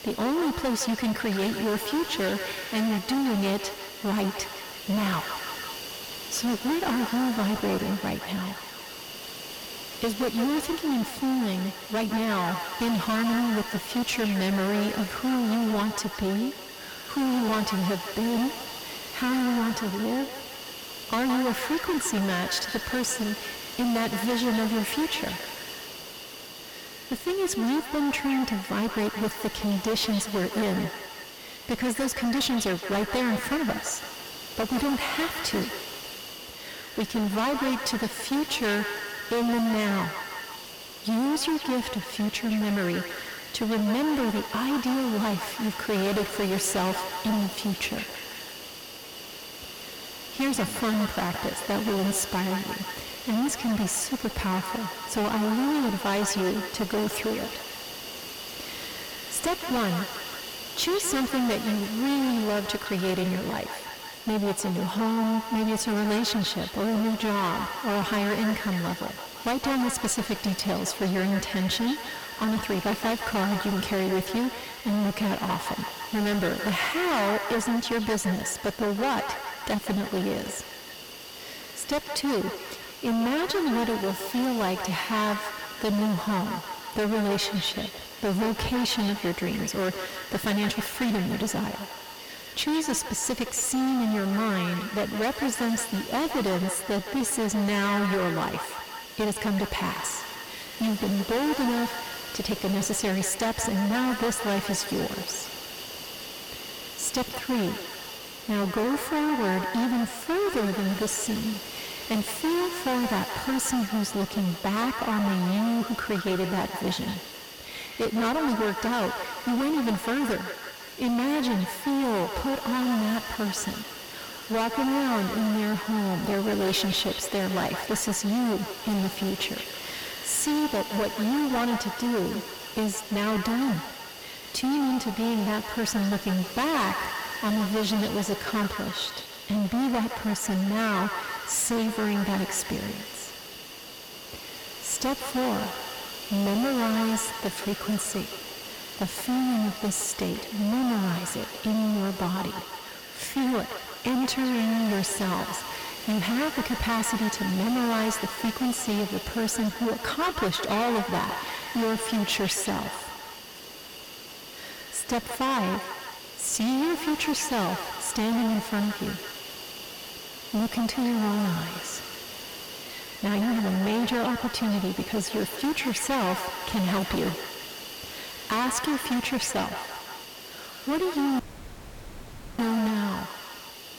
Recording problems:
distortion; heavy; 22% of the sound clipped
echo of what is said; strong; throughout; 170 ms later, 10 dB below the speech
hiss; noticeable; throughout; 10 dB below the speech
audio cutting out; at 3:01 for 1 s

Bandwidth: 17.5 kHz